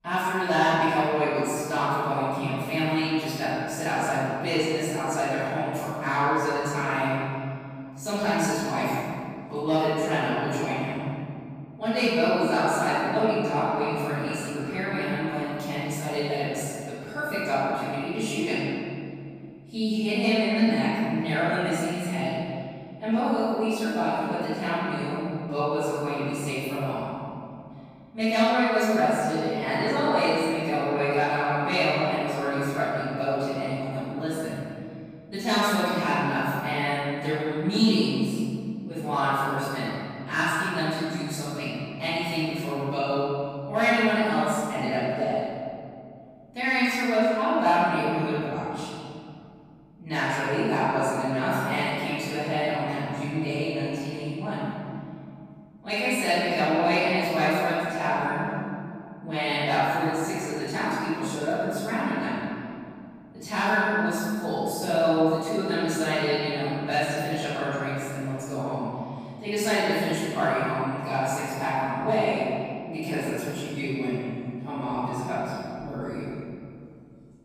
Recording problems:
room echo; strong; dies away in 2.5 s
off-mic speech; far

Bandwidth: 15 kHz